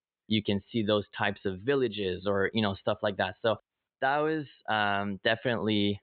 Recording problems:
high frequencies cut off; severe; nothing above 4 kHz

